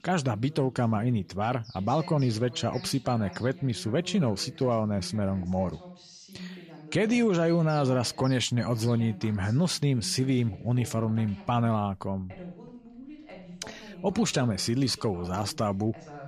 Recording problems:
voice in the background; noticeable; throughout; 20 dB below the speech
animal sounds; faint; throughout; 20 dB below the speech

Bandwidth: 15 kHz